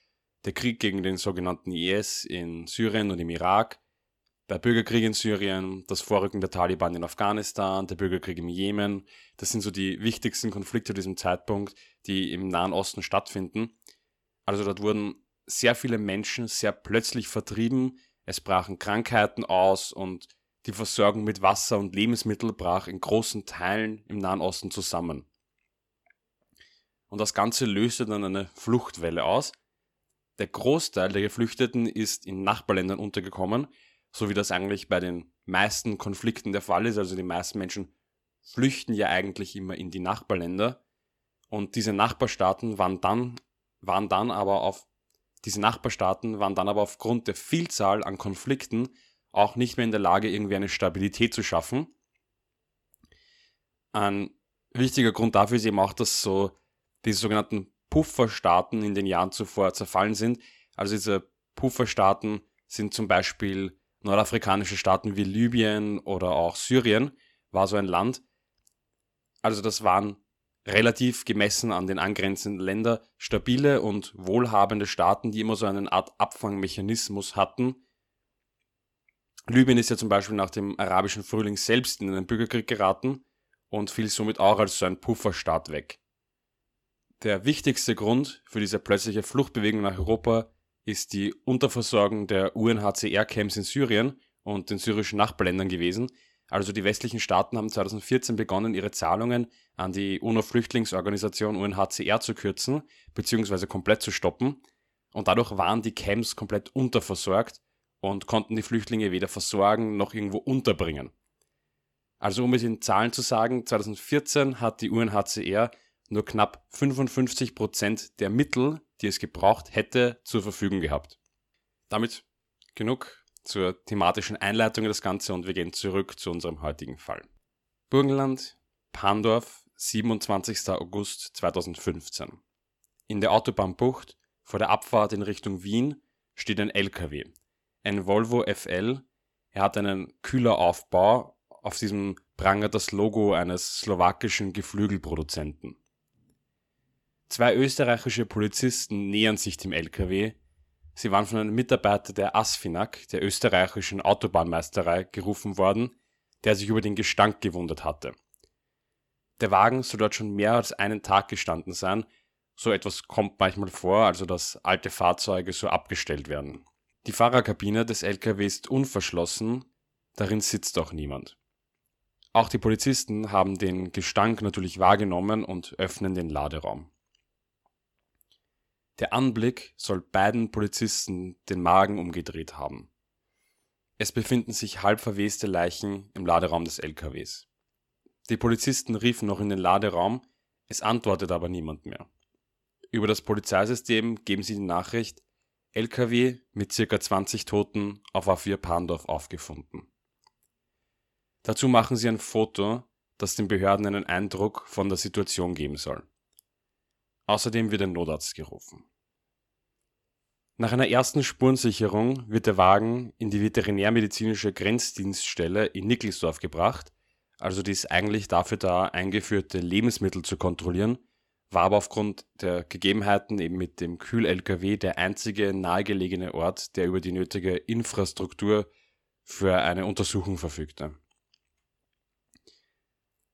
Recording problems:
none

